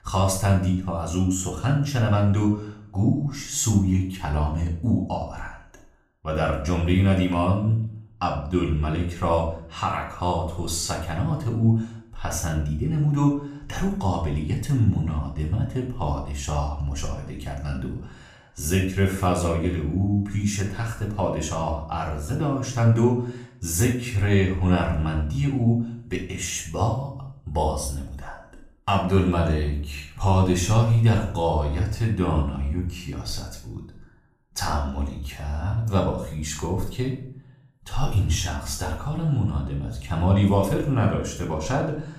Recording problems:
room echo; noticeable; dies away in 0.5 s
off-mic speech; somewhat distant

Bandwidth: 14.5 kHz